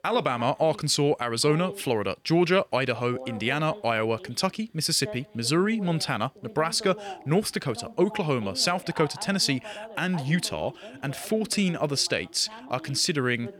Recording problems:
voice in the background; noticeable; throughout; 15 dB below the speech

